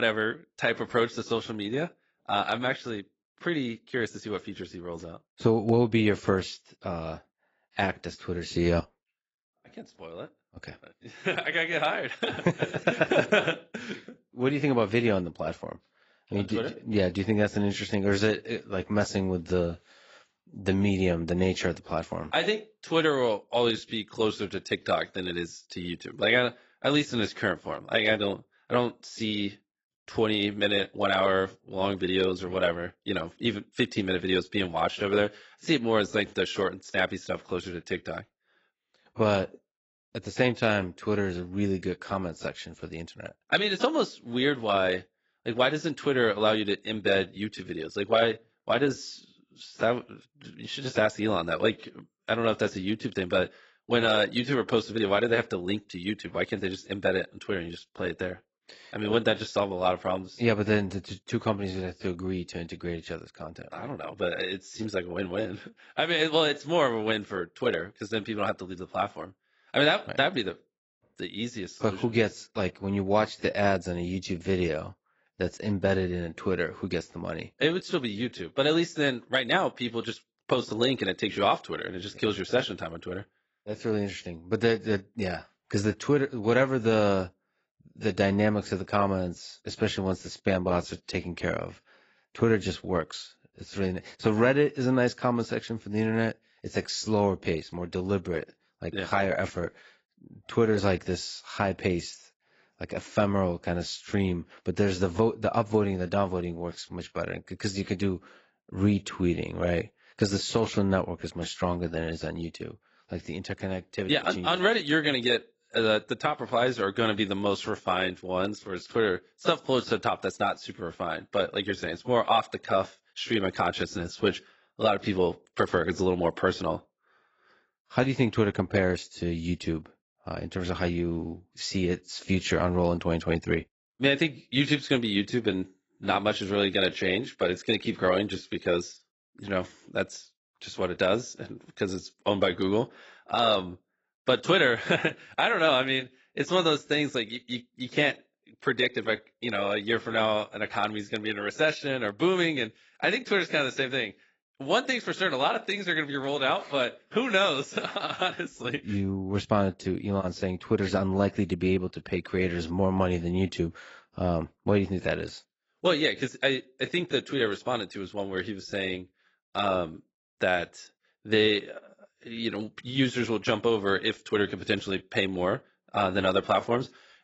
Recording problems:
garbled, watery; badly; nothing above 7.5 kHz
abrupt cut into speech; at the start

